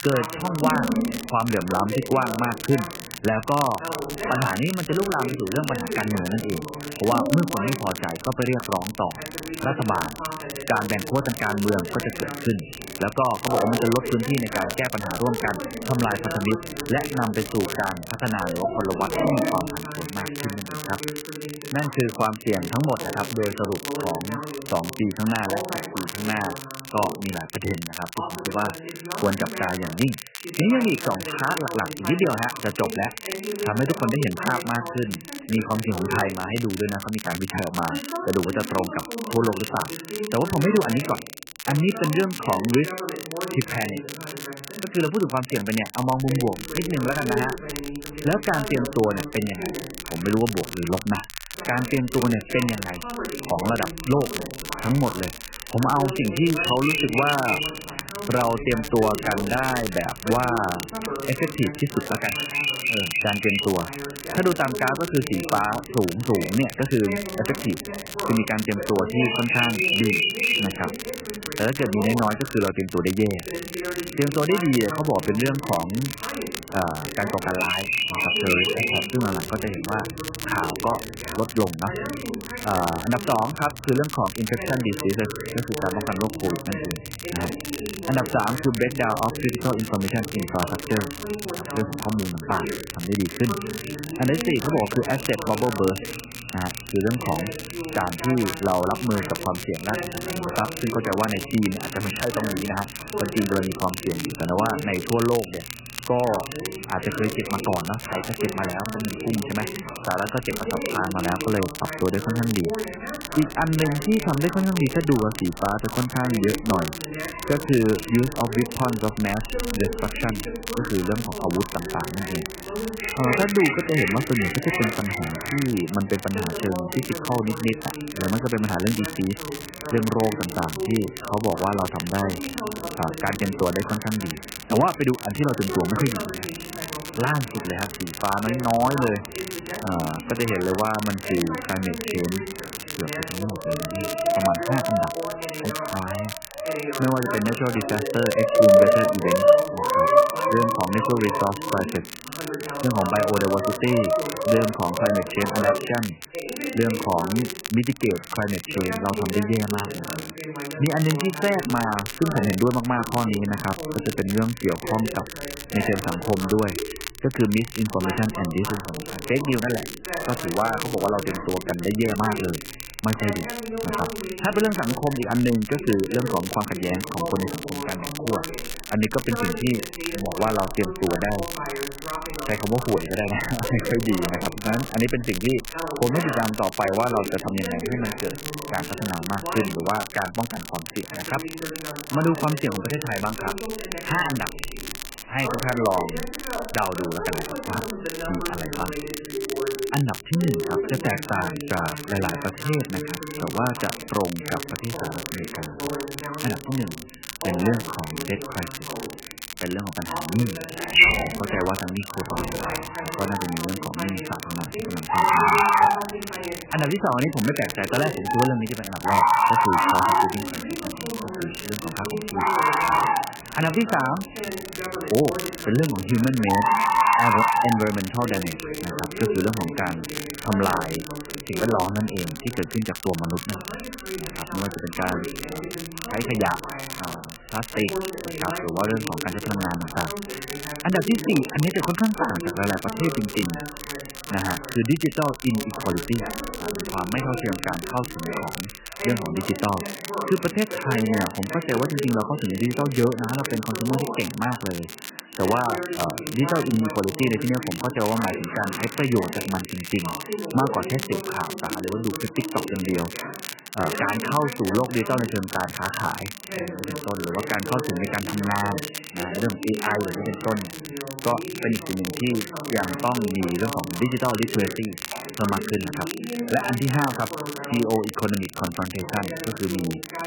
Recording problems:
garbled, watery; badly; nothing above 3 kHz
animal sounds; very loud; throughout; 1 dB above the speech
voice in the background; loud; throughout; 8 dB below the speech
crackle, like an old record; loud; 10 dB below the speech

